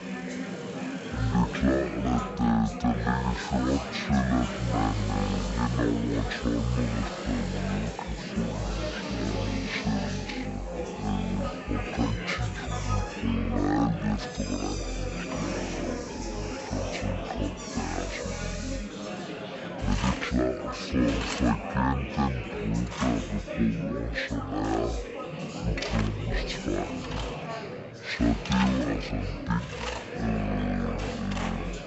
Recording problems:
wrong speed and pitch; too slow and too low; 0.5 times normal speed
chatter from many people; loud; throughout; 6 dB below the speech
machinery noise; noticeable; throughout; 10 dB below the speech

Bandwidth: 8 kHz